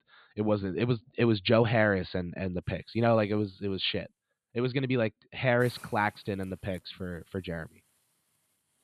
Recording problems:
high frequencies cut off; severe; nothing above 4.5 kHz
hiss; faint; from 2.5 s on; 25 dB below the speech

